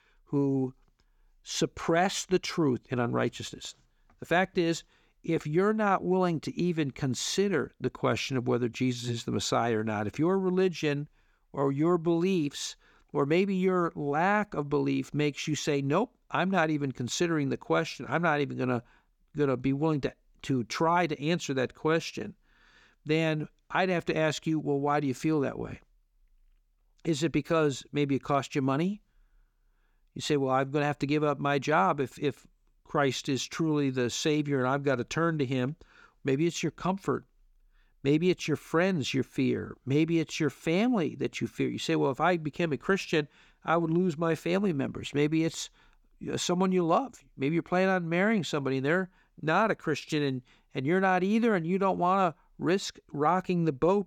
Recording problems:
none

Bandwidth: 18.5 kHz